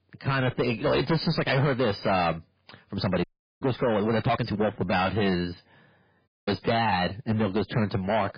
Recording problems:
distortion; heavy; 7 dB below the speech
garbled, watery; badly
uneven, jittery; strongly; from 3 to 7 s
audio cutting out; at 3 s and at 6.5 s

